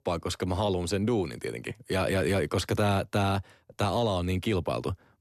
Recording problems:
none

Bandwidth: 13.5 kHz